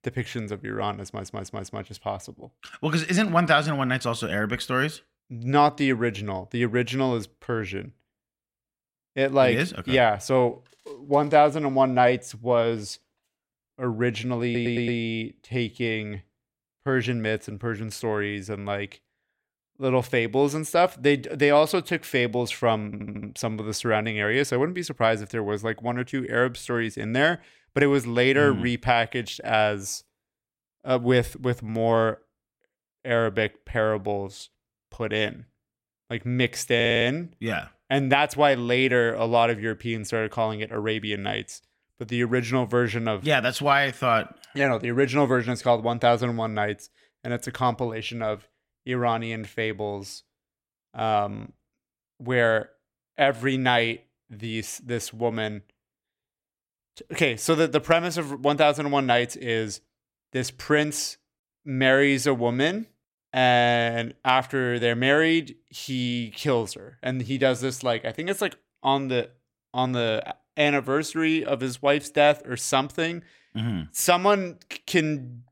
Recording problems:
audio stuttering; 4 times, first at 1 s

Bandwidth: 16 kHz